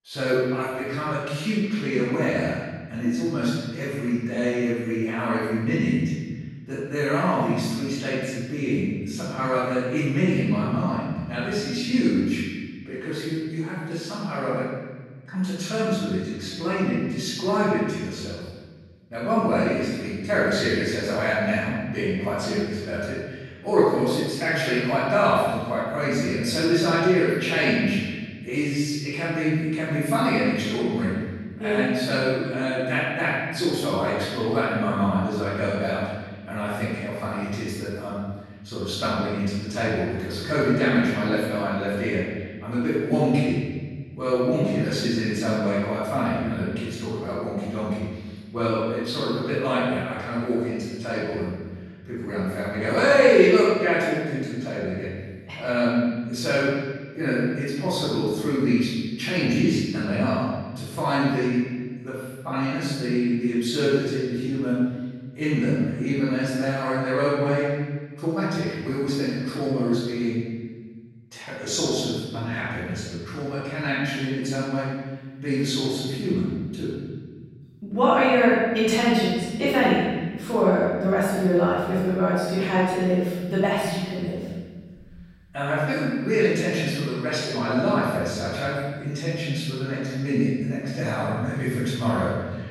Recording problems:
room echo; strong; dies away in 1.5 s
off-mic speech; far

